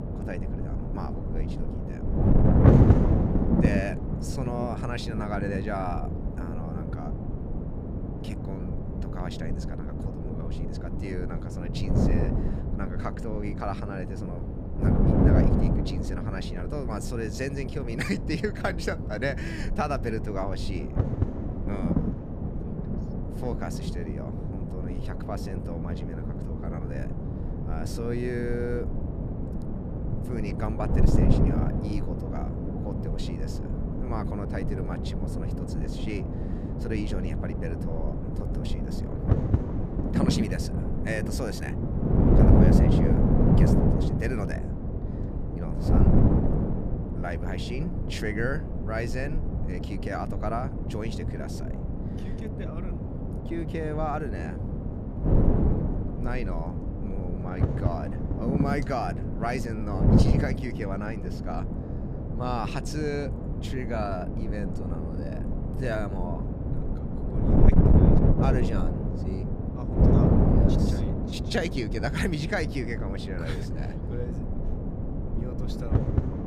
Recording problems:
wind noise on the microphone; heavy; as loud as the speech

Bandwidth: 14.5 kHz